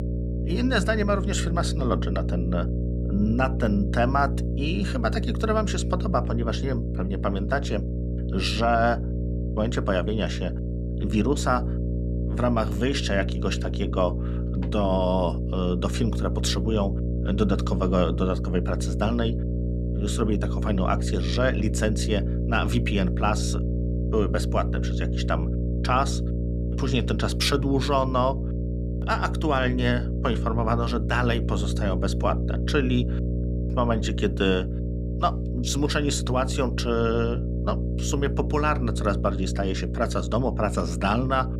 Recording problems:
electrical hum; noticeable; throughout; 60 Hz, 10 dB below the speech

